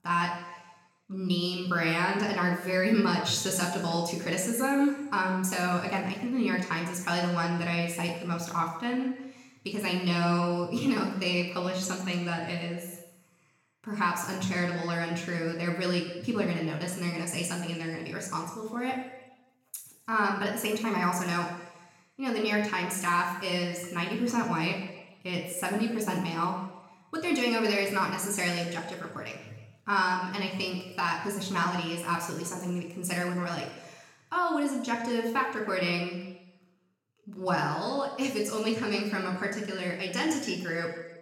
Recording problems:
room echo; noticeable; dies away in 1 s
off-mic speech; somewhat distant

